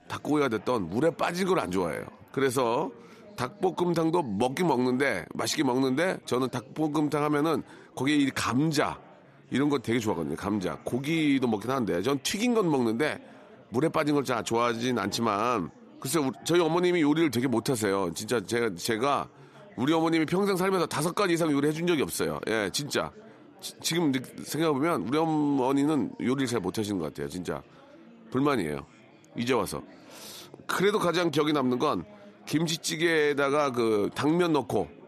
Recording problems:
chatter from many people; faint; throughout; 25 dB below the speech

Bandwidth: 13.5 kHz